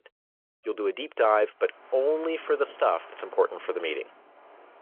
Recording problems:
phone-call audio
wind in the background; faint; from 1.5 s on; 25 dB below the speech

